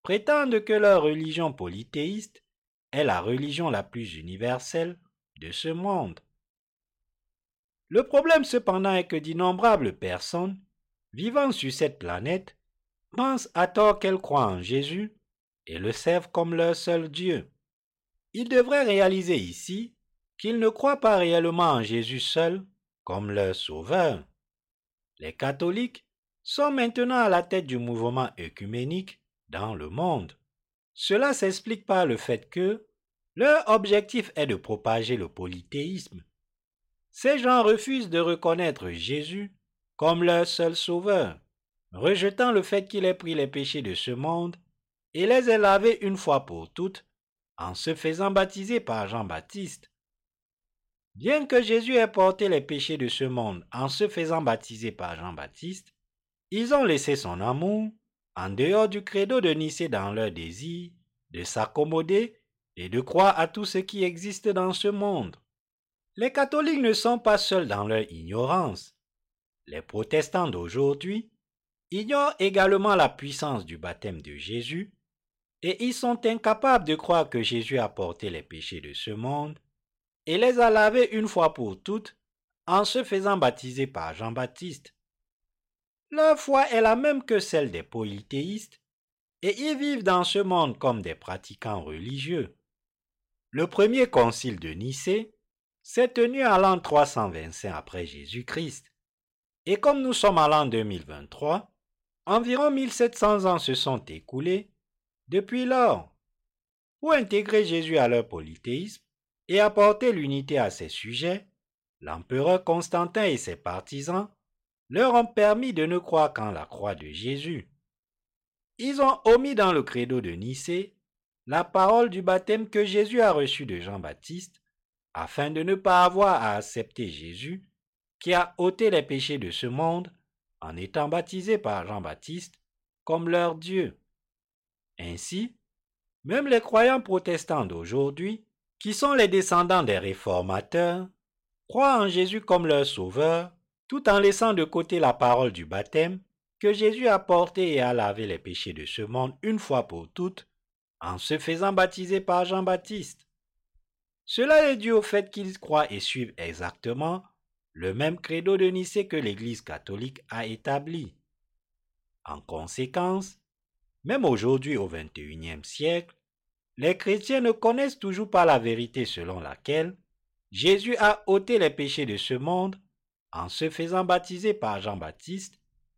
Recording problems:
none

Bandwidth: 16 kHz